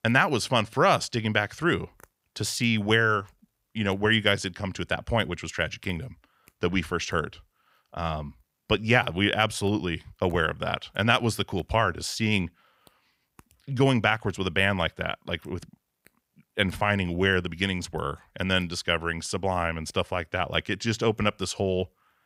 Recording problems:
none

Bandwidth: 15.5 kHz